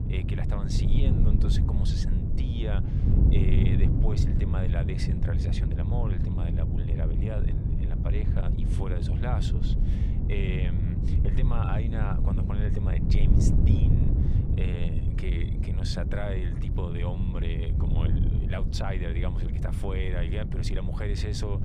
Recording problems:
wind noise on the microphone; heavy; 1 dB below the speech

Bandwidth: 15 kHz